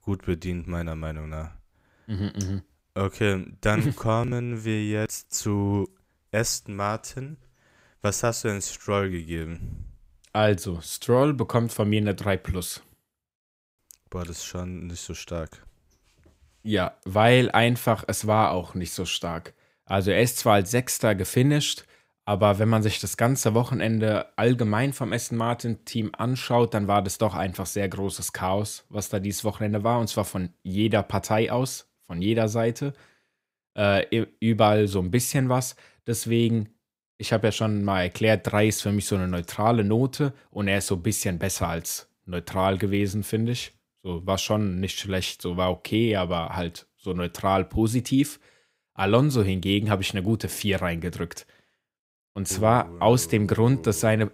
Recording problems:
none

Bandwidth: 15.5 kHz